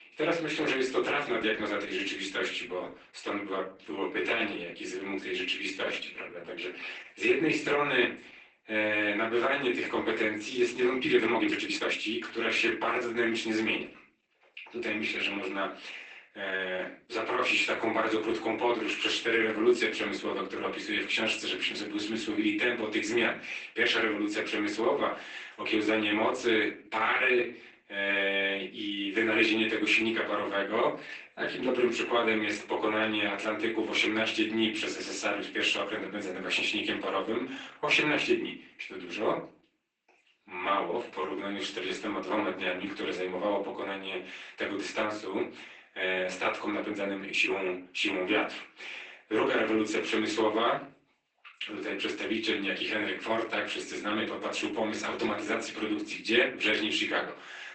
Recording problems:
off-mic speech; far
garbled, watery; badly; nothing above 8 kHz
thin; somewhat; fading below 300 Hz
room echo; slight; dies away in 0.4 s
uneven, jittery; strongly; from 3.5 to 48 s

